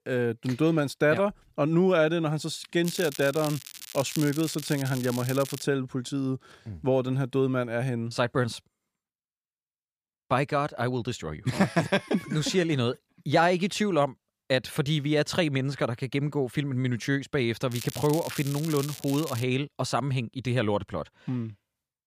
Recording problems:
crackling; noticeable; from 3 to 5.5 s and from 18 to 19 s; 10 dB below the speech

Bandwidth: 15 kHz